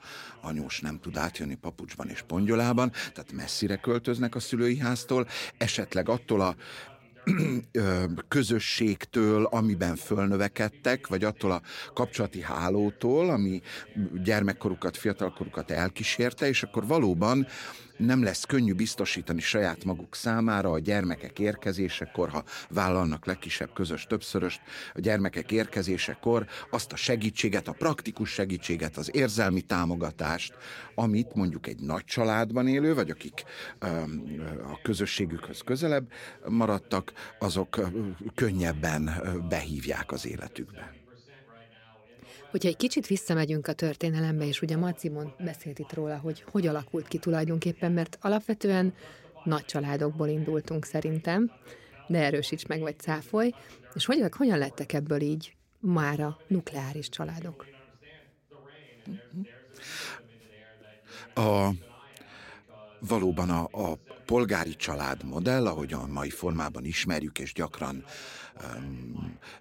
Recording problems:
voice in the background; faint; throughout; 25 dB below the speech

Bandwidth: 16 kHz